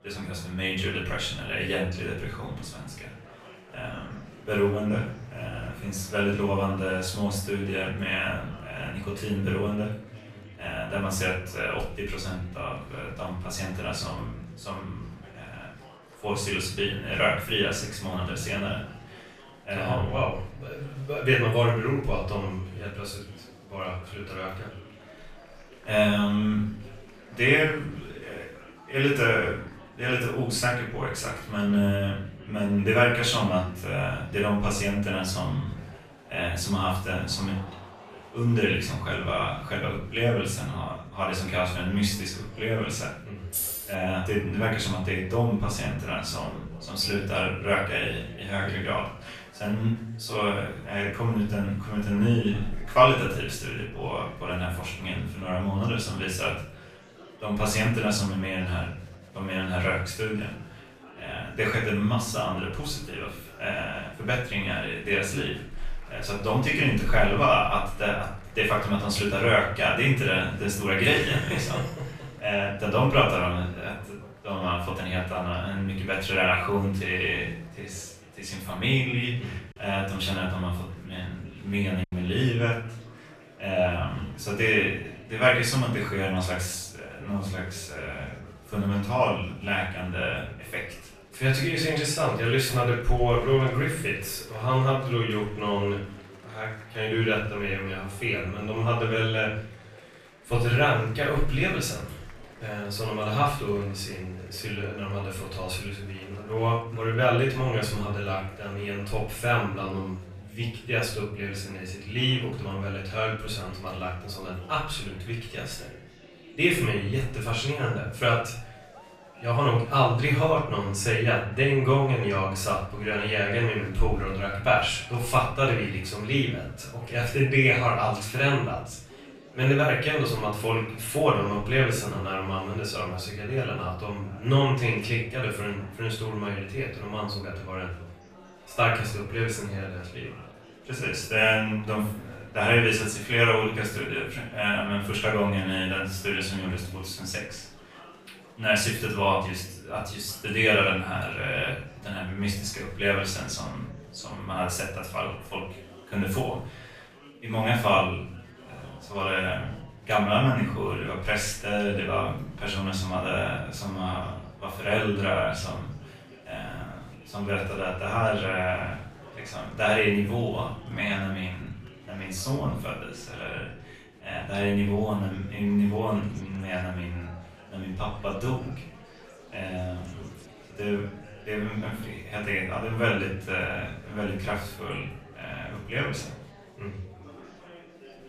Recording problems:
off-mic speech; far
room echo; noticeable; dies away in 0.5 s
murmuring crowd; faint; throughout; 20 dB below the speech
jangling keys; noticeable; at 44 s; peak 1 dB below the speech
choppy; occasionally; at 1:22; 2% of the speech affected

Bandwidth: 14.5 kHz